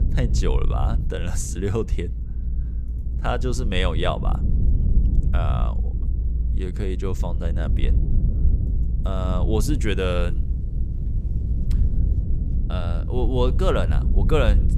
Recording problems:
low rumble; noticeable; throughout; 10 dB below the speech

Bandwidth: 15 kHz